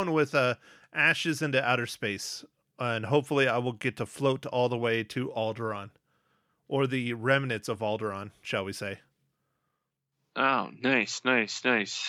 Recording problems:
abrupt cut into speech; at the start and the end

